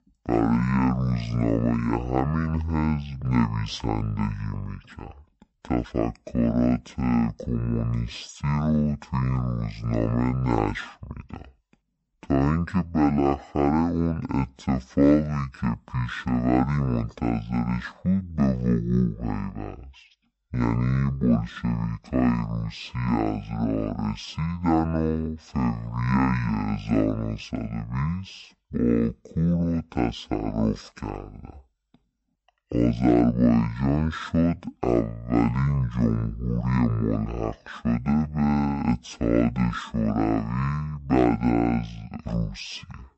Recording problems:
wrong speed and pitch; too slow and too low; 0.5 times normal speed

